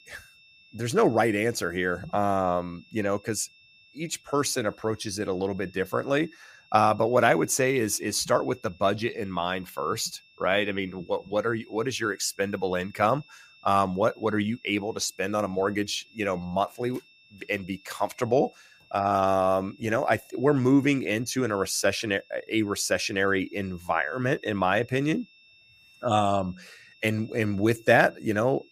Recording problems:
high-pitched whine; faint; throughout; 2.5 kHz, 30 dB below the speech

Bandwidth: 15 kHz